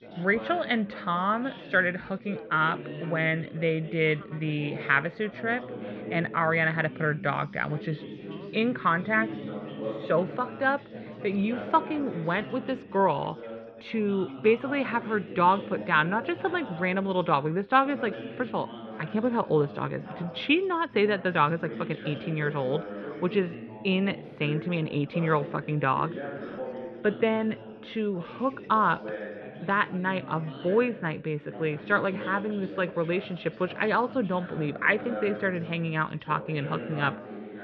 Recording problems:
muffled; very; fading above 3.5 kHz
background chatter; noticeable; throughout; 3 voices, 10 dB below the speech

